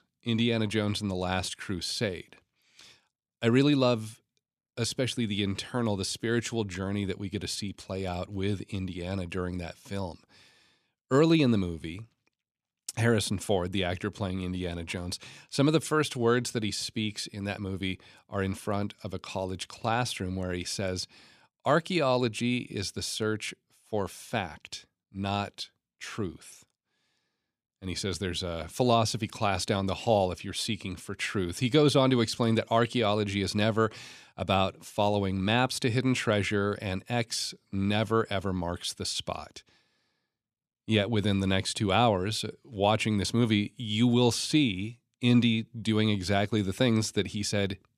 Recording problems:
none

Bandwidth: 14.5 kHz